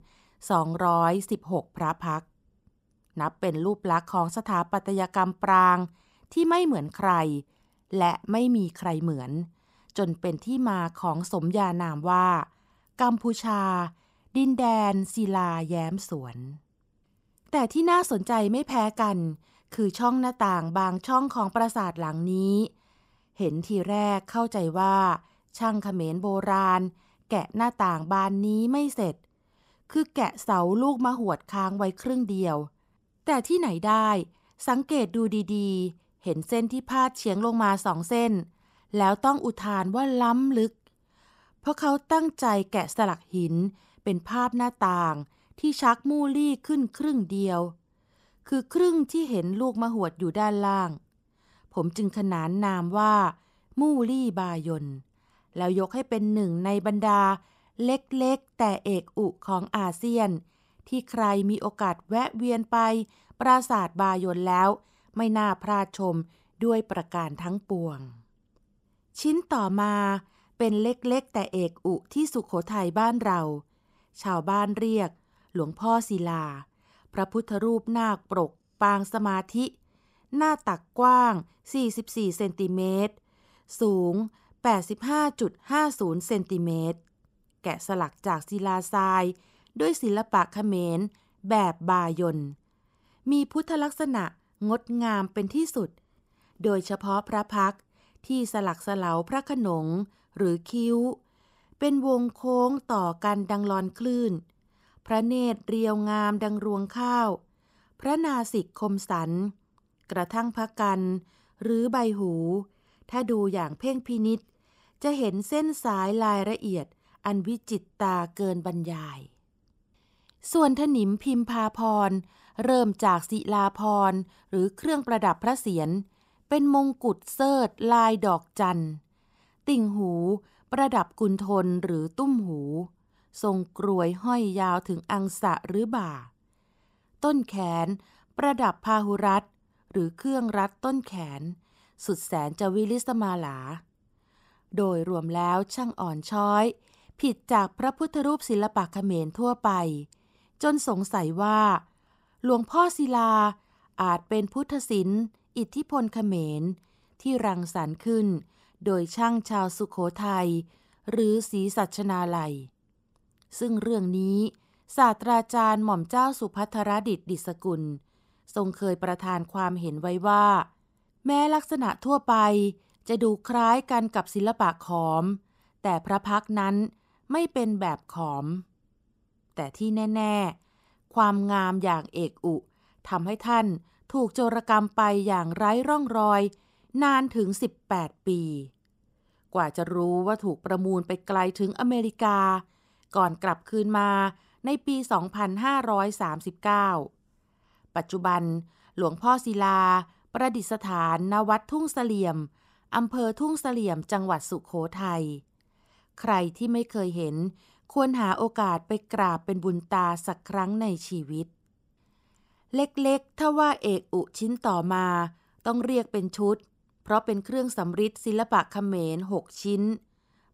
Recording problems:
none

